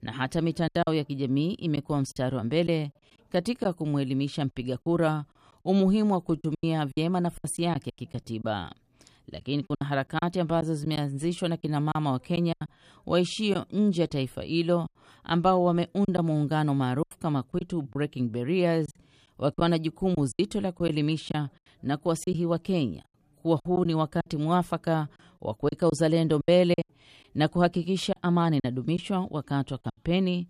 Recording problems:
choppy; very; 7% of the speech affected

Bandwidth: 14.5 kHz